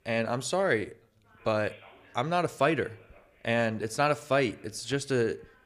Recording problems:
background chatter; faint; throughout; 3 voices, 30 dB below the speech

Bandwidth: 15 kHz